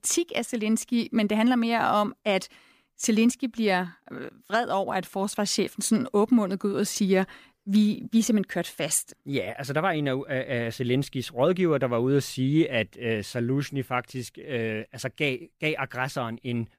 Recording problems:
none

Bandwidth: 15 kHz